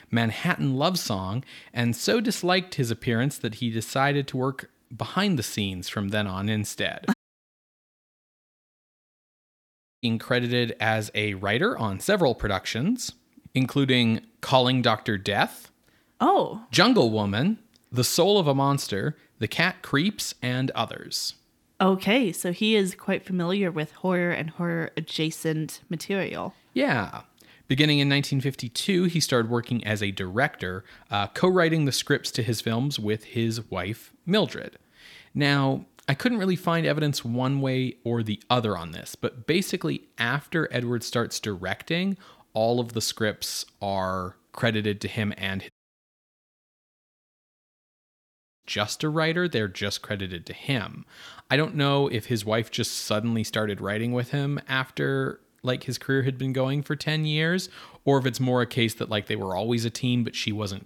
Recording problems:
audio cutting out; at 7 s for 3 s and at 46 s for 3 s

